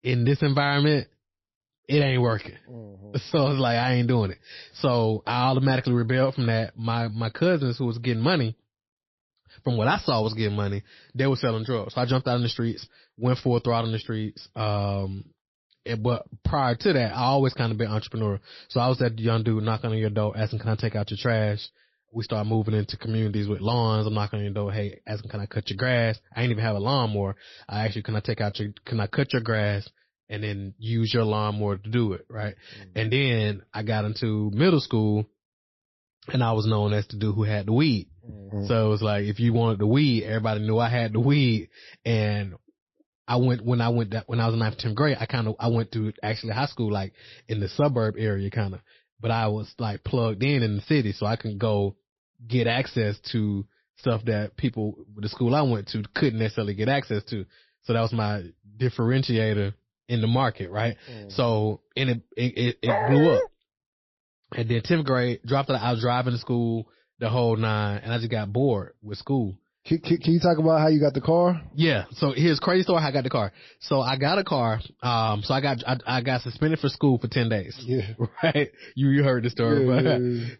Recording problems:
garbled, watery; slightly; nothing above 5.5 kHz
dog barking; loud; at 1:03; peak 1 dB above the speech

